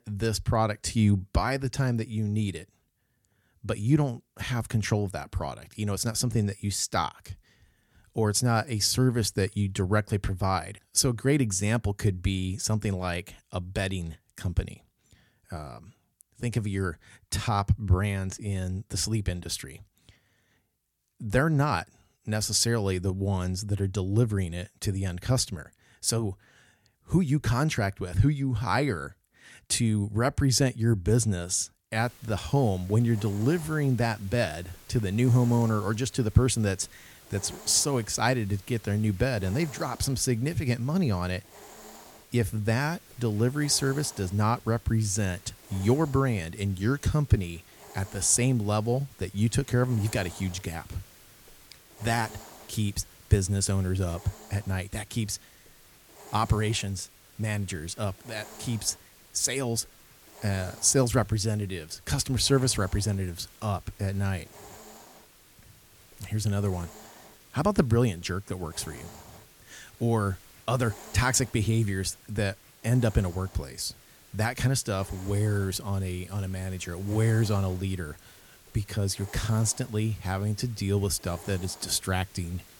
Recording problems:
hiss; faint; from 32 s on; 20 dB below the speech

